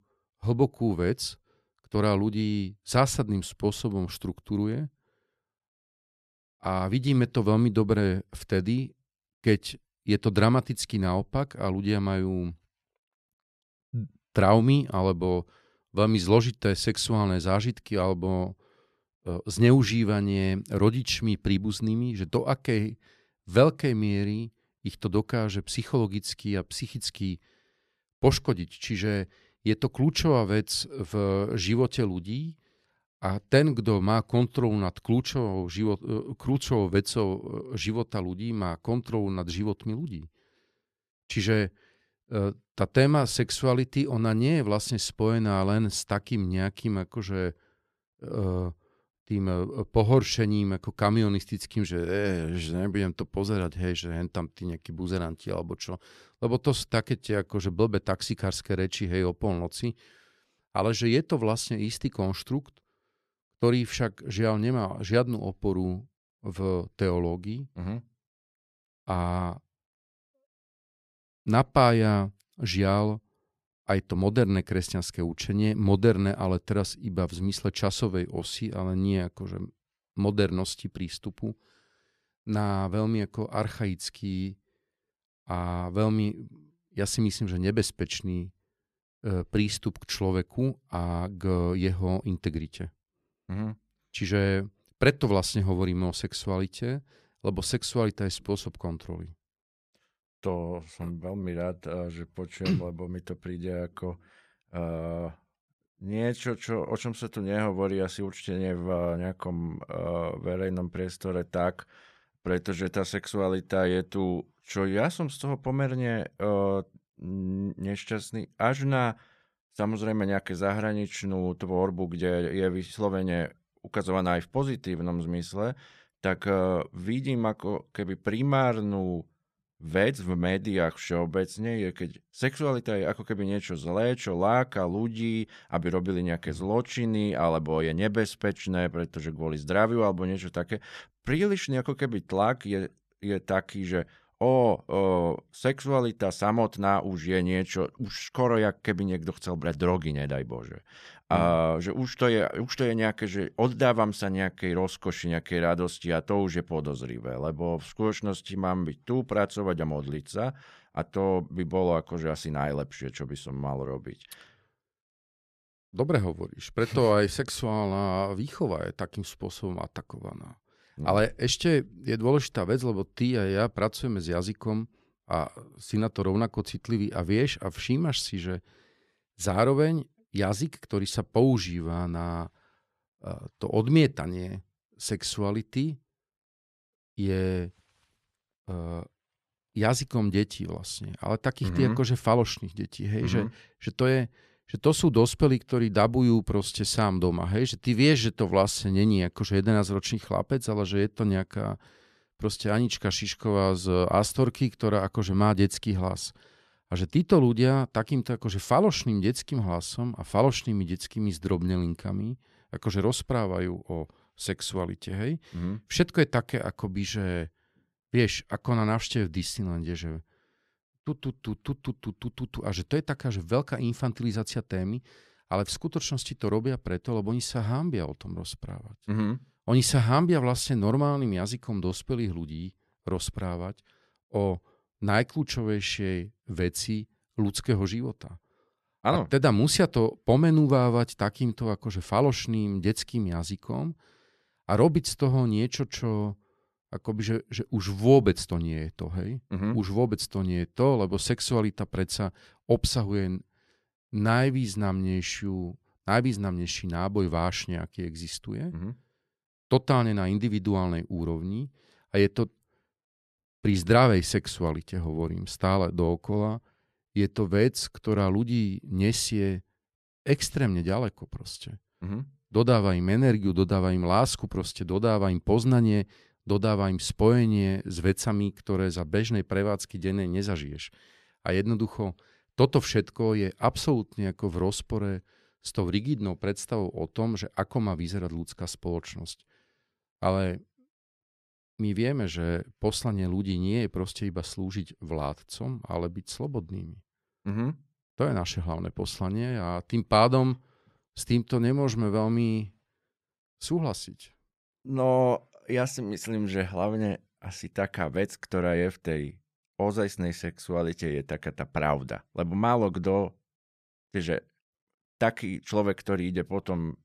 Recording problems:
none

